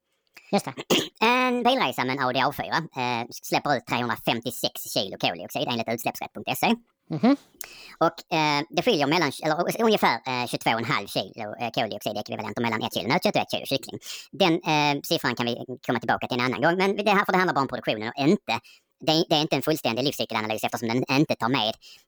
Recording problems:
wrong speed and pitch; too fast and too high; 1.5 times normal speed

